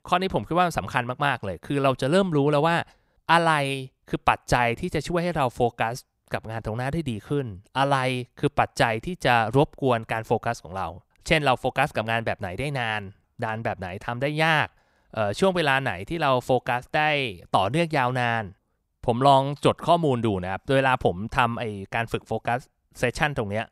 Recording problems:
none

